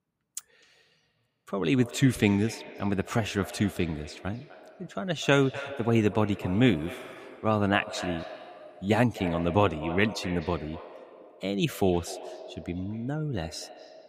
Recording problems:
echo of what is said; noticeable; throughout; 250 ms later, 15 dB below the speech

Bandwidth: 15.5 kHz